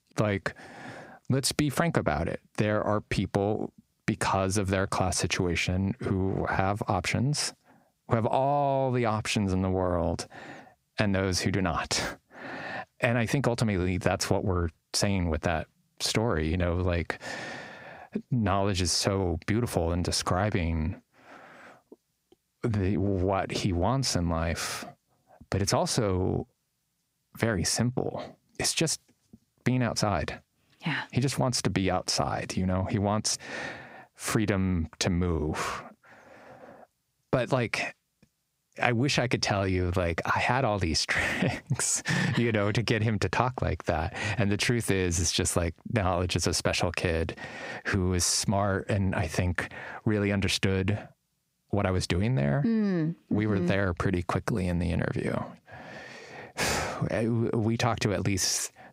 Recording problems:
squashed, flat; heavily

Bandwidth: 15.5 kHz